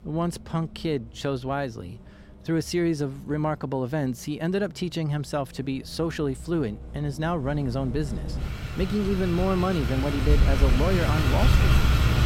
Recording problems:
traffic noise; very loud; throughout; 2 dB above the speech

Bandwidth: 16 kHz